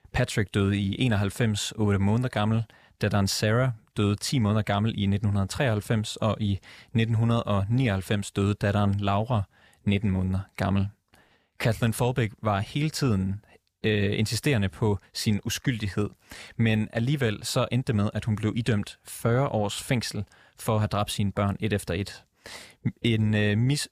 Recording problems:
none

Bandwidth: 15 kHz